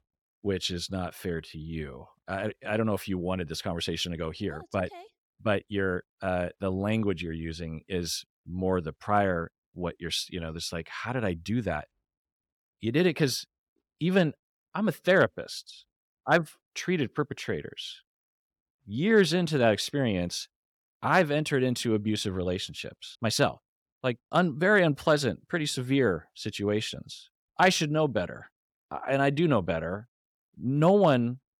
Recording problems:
none

